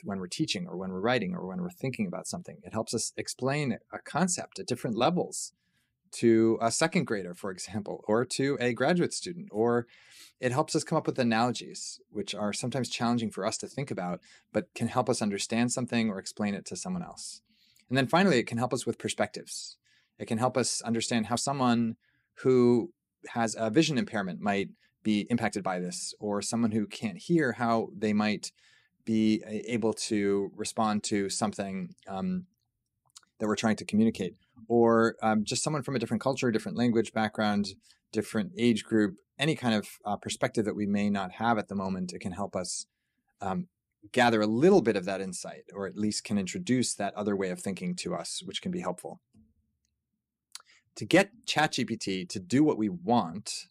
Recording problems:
uneven, jittery; strongly; from 1.5 to 53 s

